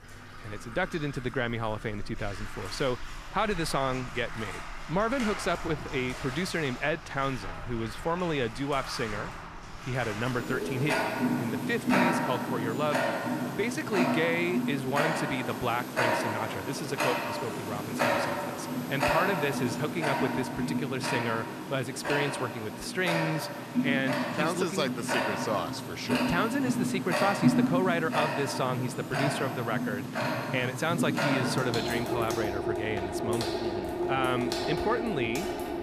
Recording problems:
household noises; very loud; throughout; as loud as the speech

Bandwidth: 14.5 kHz